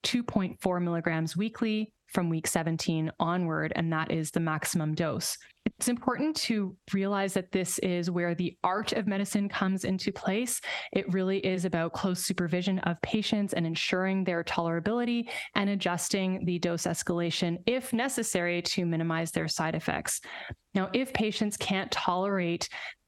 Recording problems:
squashed, flat; heavily

